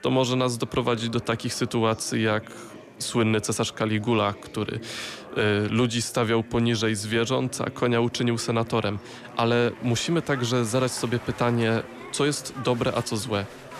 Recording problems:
chatter from many people; noticeable; throughout; 15 dB below the speech

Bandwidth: 13.5 kHz